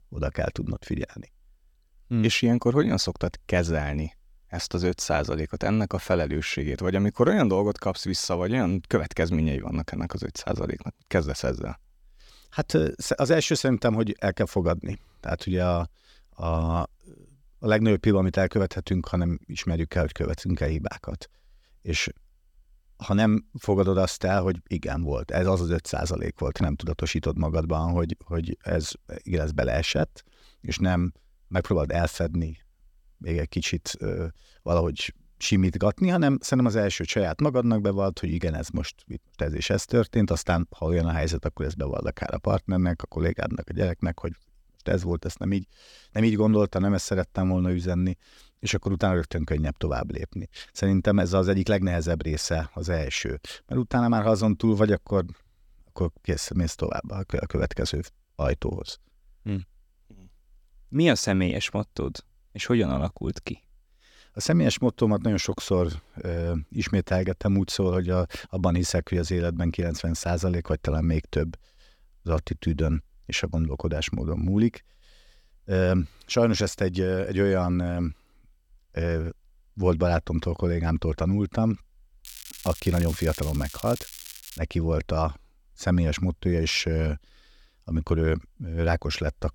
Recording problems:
crackling; noticeable; from 1:22 to 1:25; 15 dB below the speech

